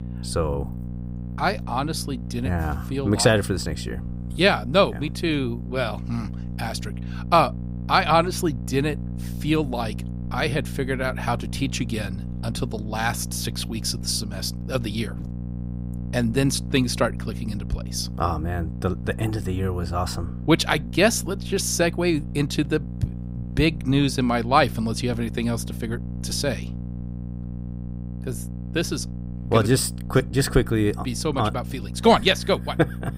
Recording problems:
electrical hum; noticeable; throughout; 60 Hz, 20 dB below the speech

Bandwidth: 15.5 kHz